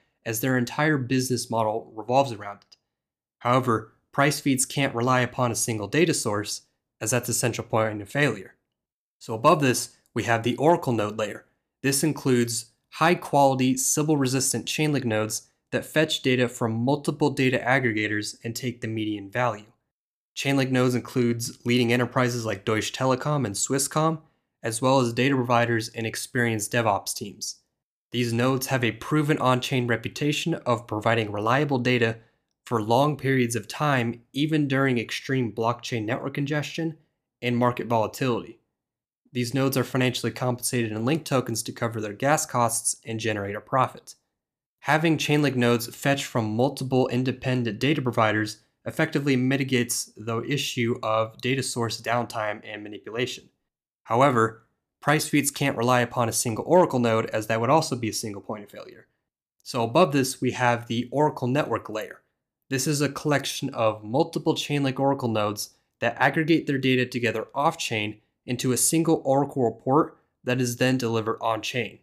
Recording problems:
none

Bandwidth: 14.5 kHz